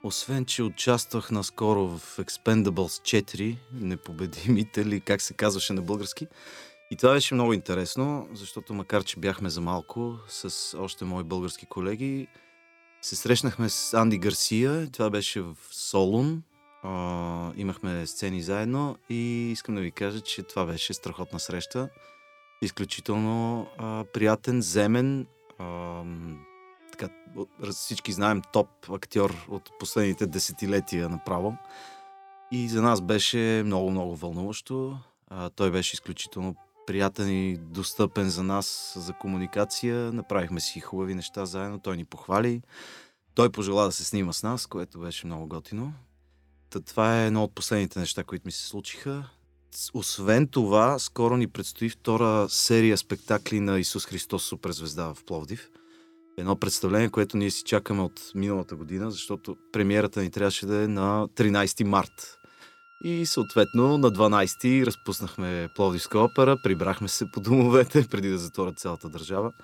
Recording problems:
background music; faint; throughout; 25 dB below the speech

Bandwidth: 18.5 kHz